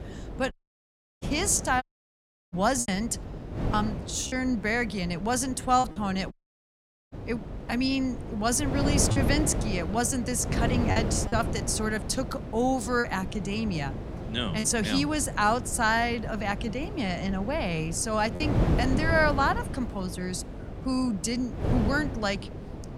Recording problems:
wind noise on the microphone; occasional gusts; 10 dB below the speech
electrical hum; faint; throughout; 50 Hz, 25 dB below the speech
choppy; occasionally; 3% of the speech affected
audio cutting out; at 0.5 s for 0.5 s, at 2 s for 0.5 s and at 6.5 s for 1 s

